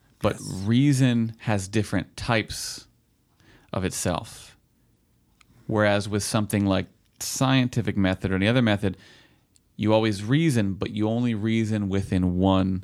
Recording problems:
none

